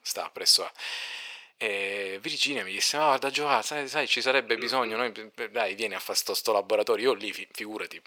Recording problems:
thin; very; fading below 550 Hz

